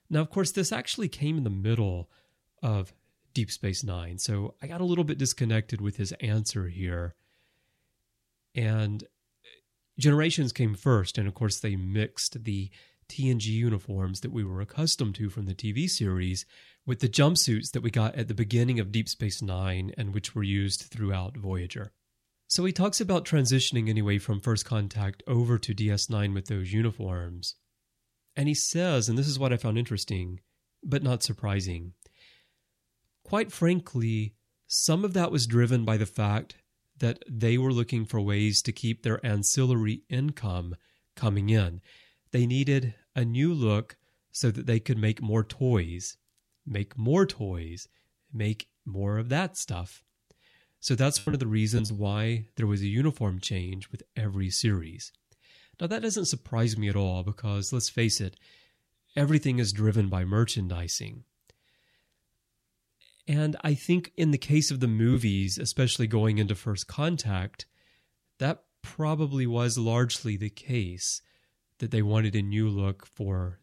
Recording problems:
choppy; occasionally; from 51 to 54 s; 3% of the speech affected

